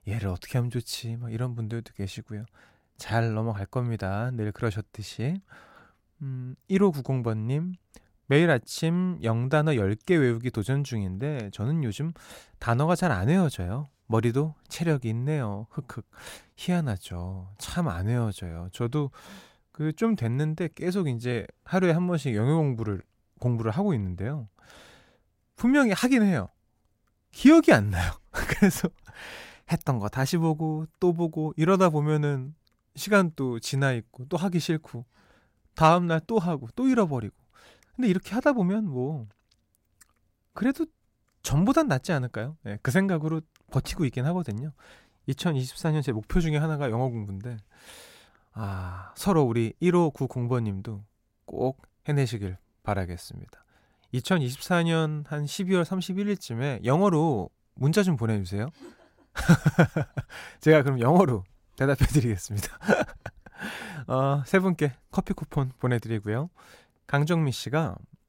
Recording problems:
none

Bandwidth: 16 kHz